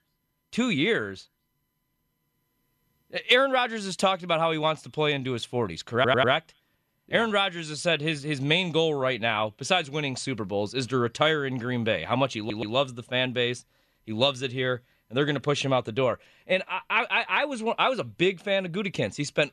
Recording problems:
audio stuttering; at 6 s and at 12 s

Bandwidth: 13.5 kHz